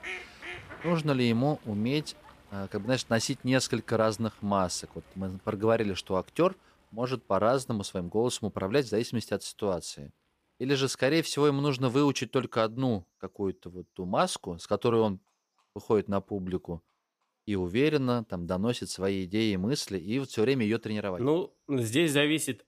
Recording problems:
animal sounds; noticeable; throughout; 20 dB below the speech

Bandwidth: 15 kHz